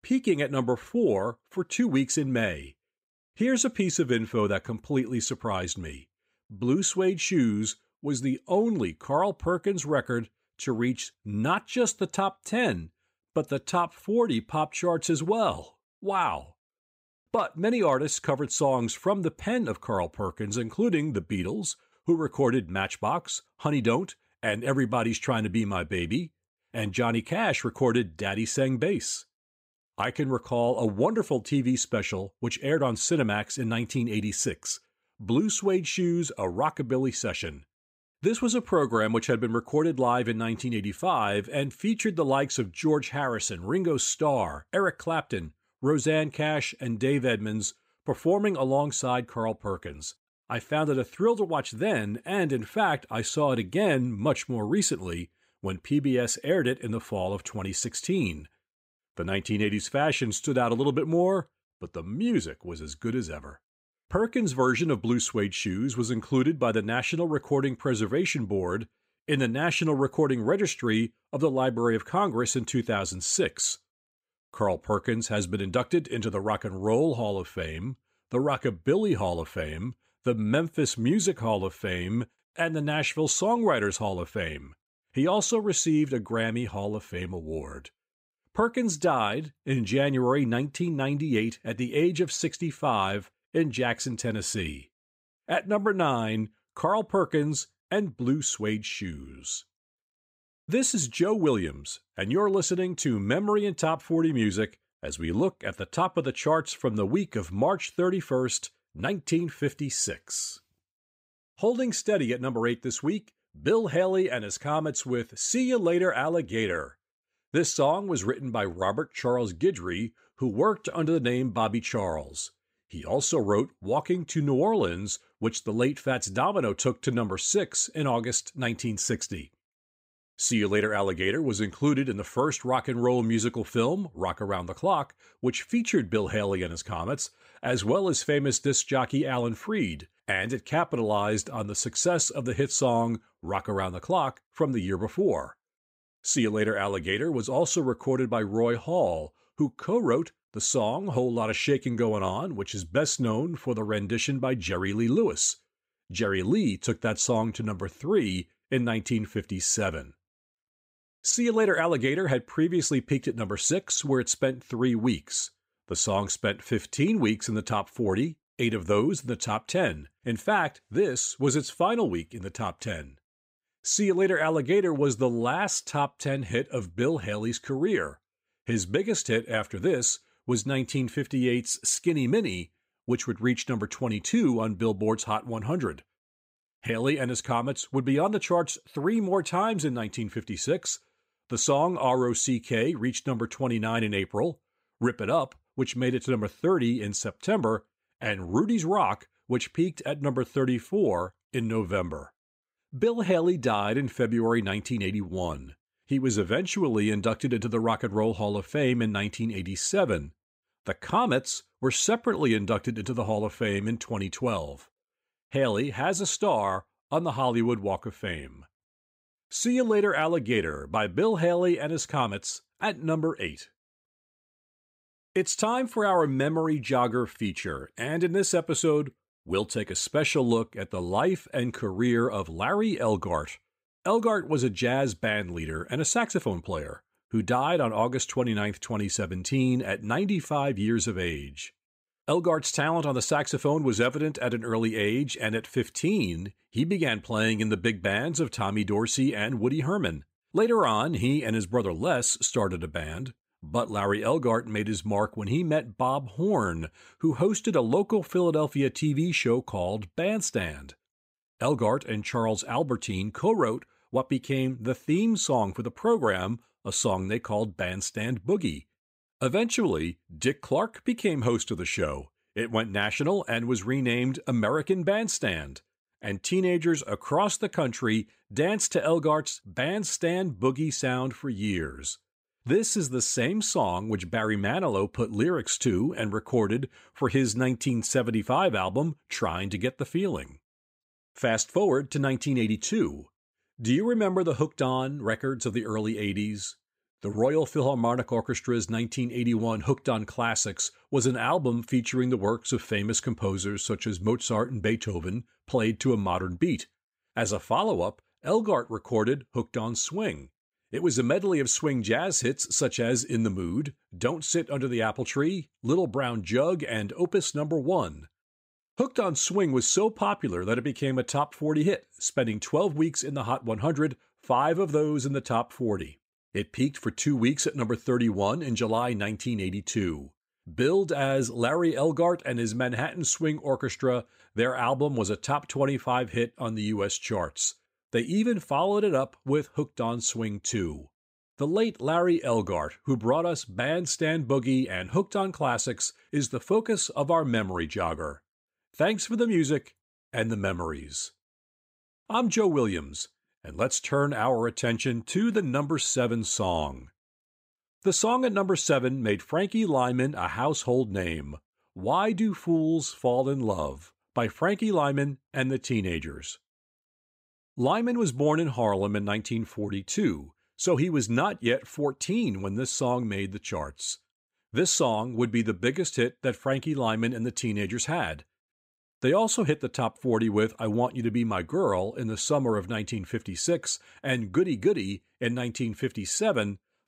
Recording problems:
none

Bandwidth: 15.5 kHz